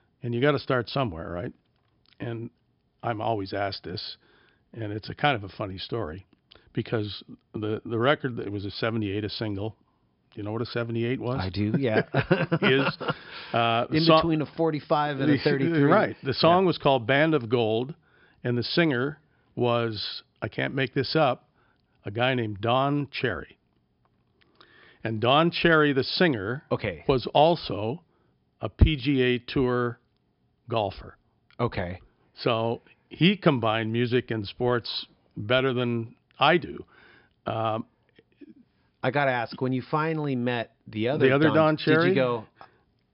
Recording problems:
high frequencies cut off; noticeable; nothing above 5 kHz

